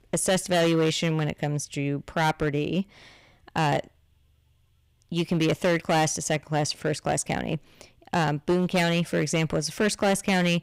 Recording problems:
distortion; heavy; 8% of the sound clipped

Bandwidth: 15.5 kHz